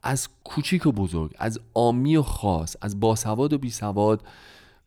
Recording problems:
none

